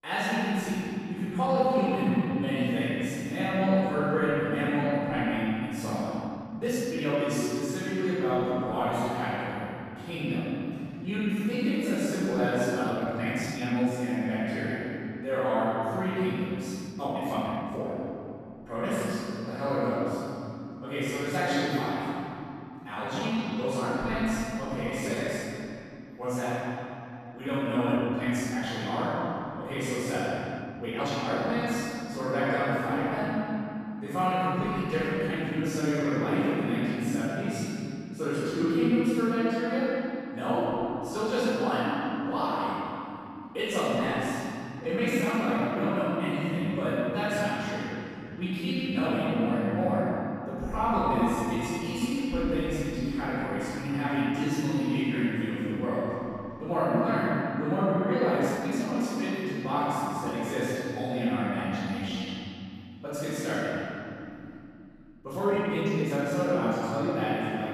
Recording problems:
room echo; strong; dies away in 3 s
off-mic speech; far
uneven, jittery; strongly; from 1.5 s to 1:06

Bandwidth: 14.5 kHz